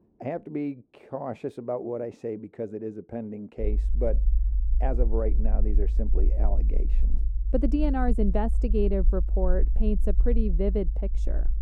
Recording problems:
muffled; very; fading above 1 kHz
low rumble; noticeable; from 3.5 s on; 20 dB below the speech

